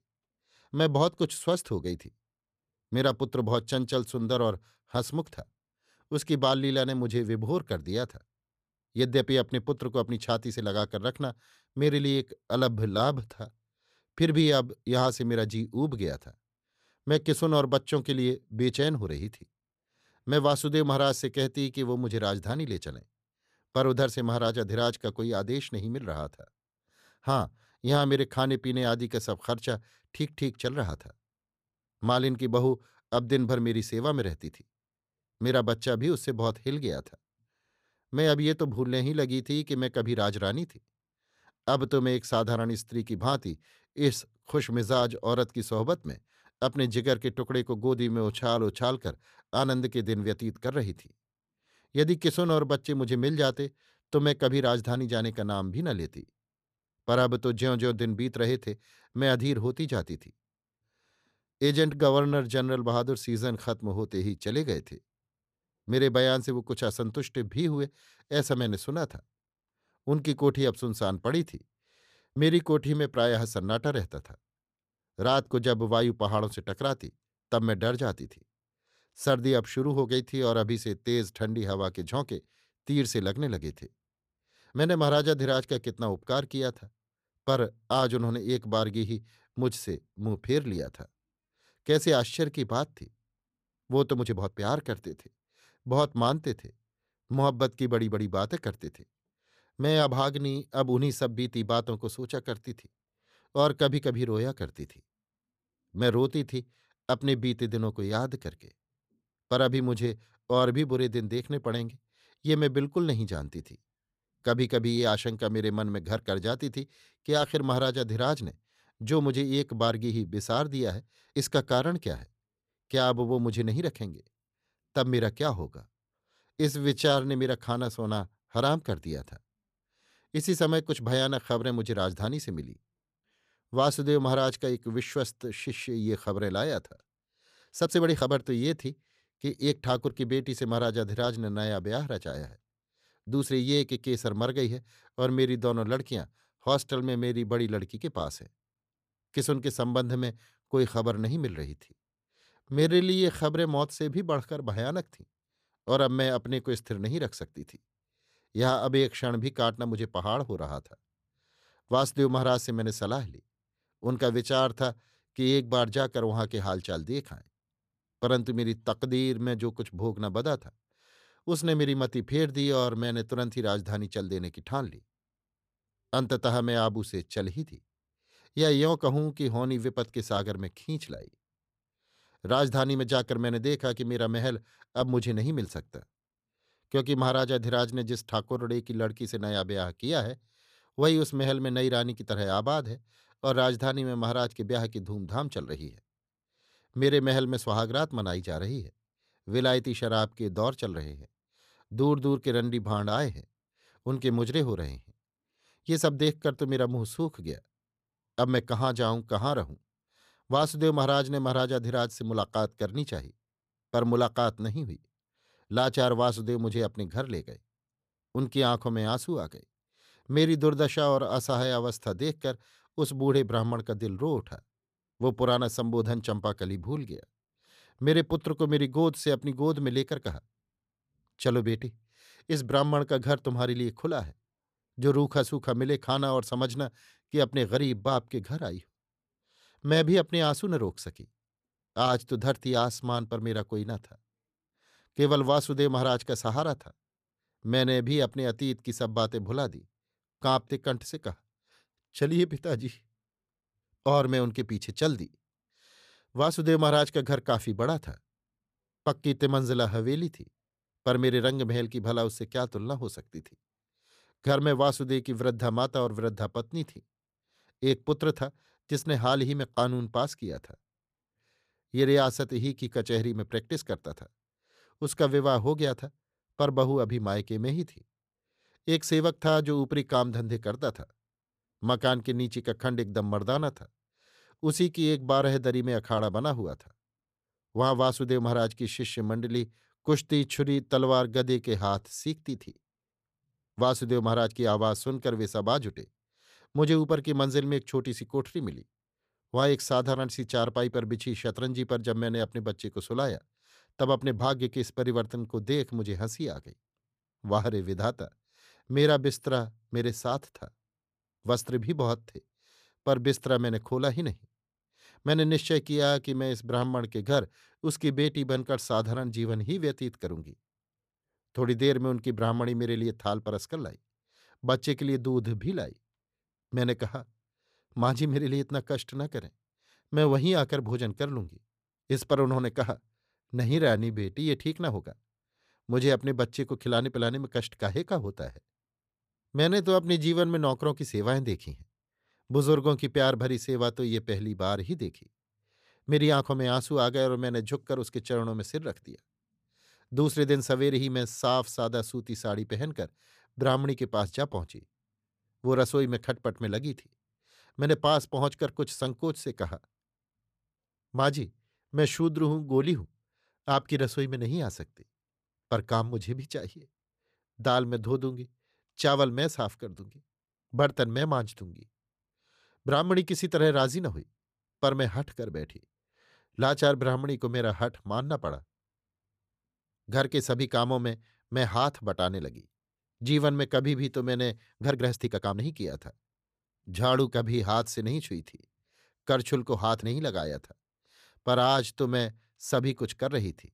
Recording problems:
uneven, jittery; strongly; from 48 s to 6:26

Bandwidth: 14.5 kHz